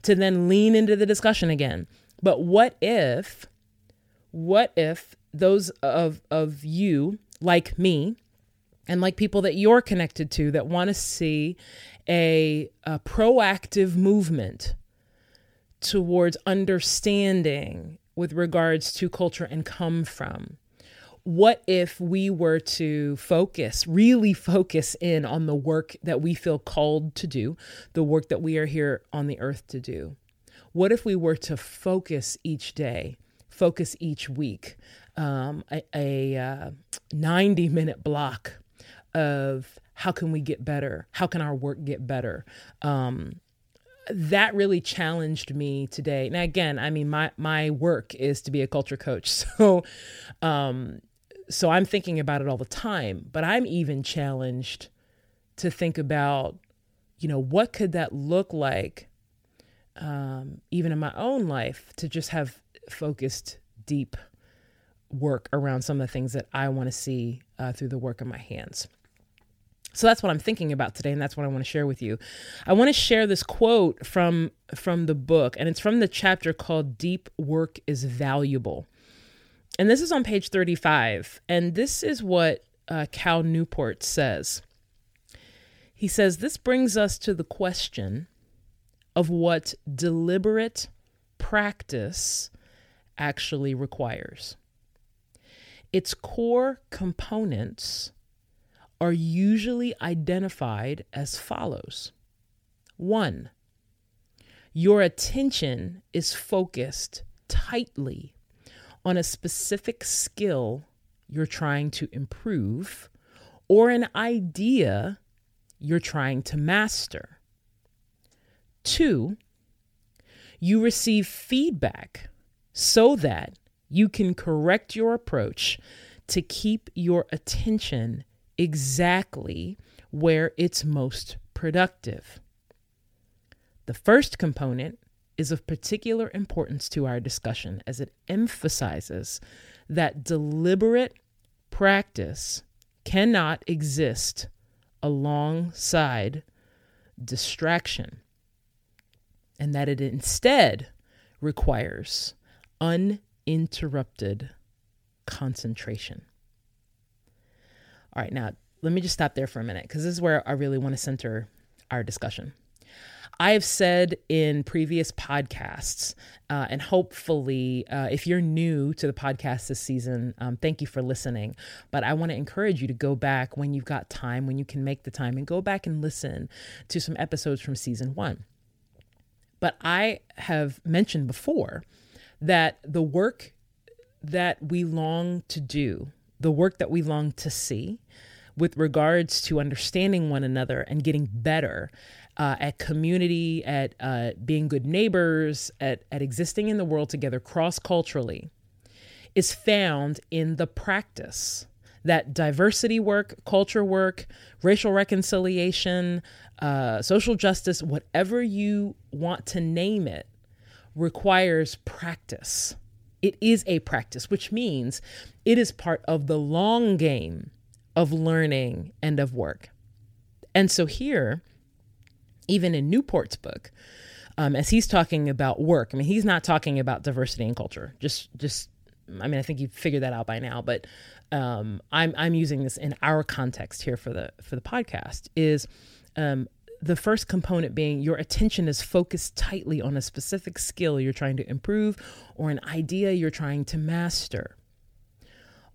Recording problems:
none

